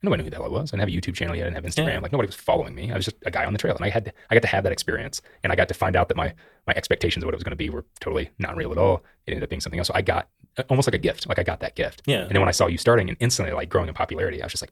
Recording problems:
wrong speed, natural pitch; too fast; 1.6 times normal speed

